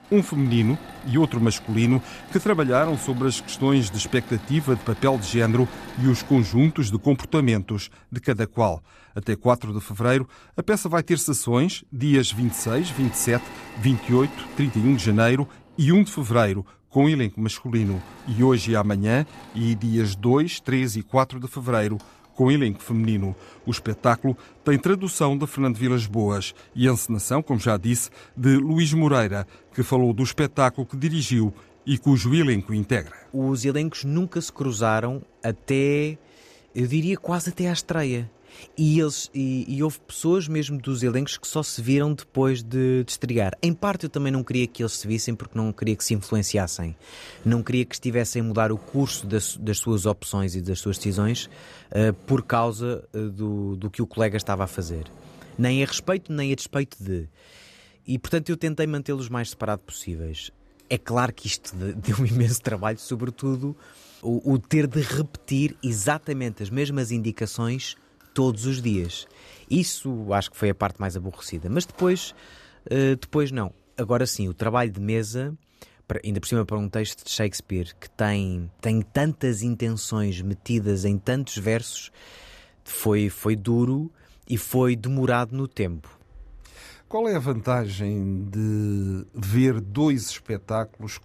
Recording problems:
machinery noise; faint; throughout; 20 dB below the speech

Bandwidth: 14 kHz